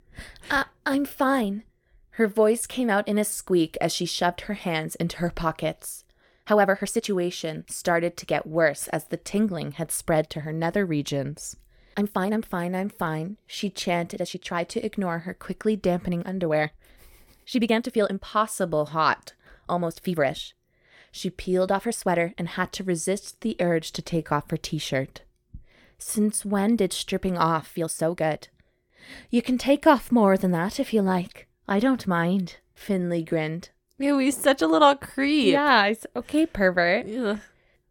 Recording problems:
uneven, jittery; strongly; from 1 to 36 s

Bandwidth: 17.5 kHz